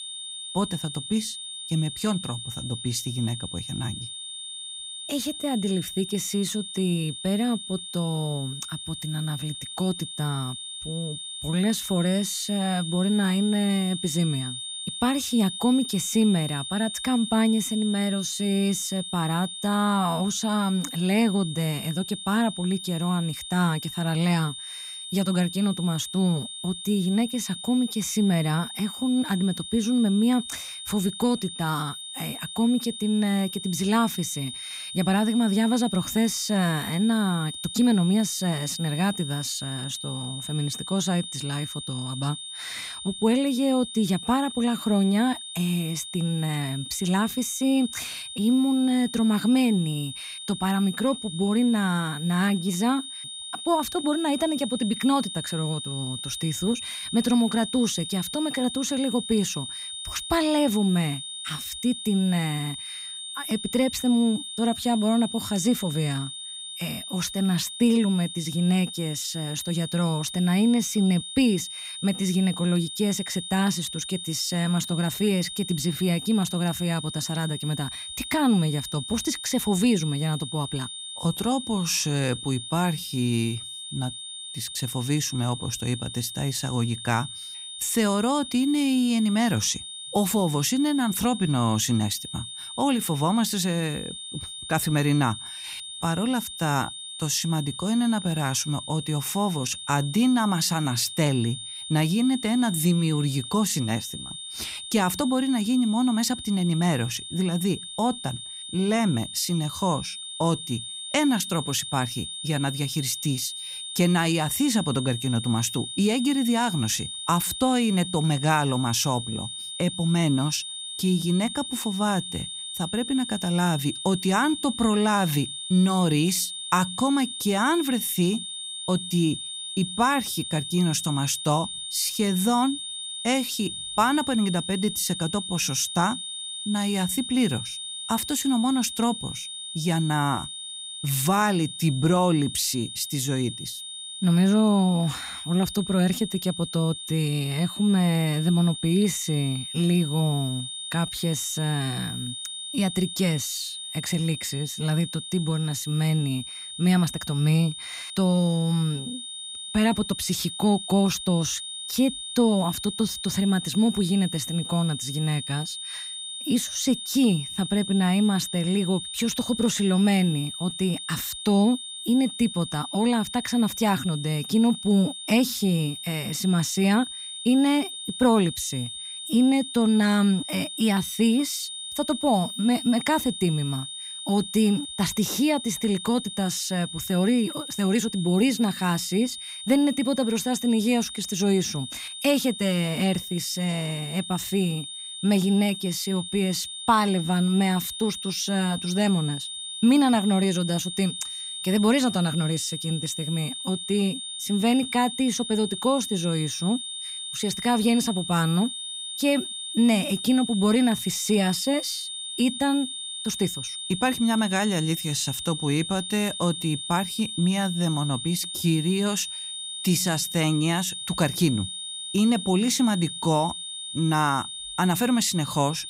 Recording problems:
high-pitched whine; loud; throughout; 3.5 kHz, 8 dB below the speech

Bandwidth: 15.5 kHz